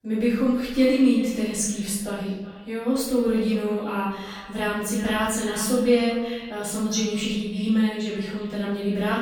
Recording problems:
off-mic speech; far
echo of what is said; noticeable; throughout; 370 ms later, 20 dB below the speech
room echo; noticeable; dies away in 0.8 s

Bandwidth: 17.5 kHz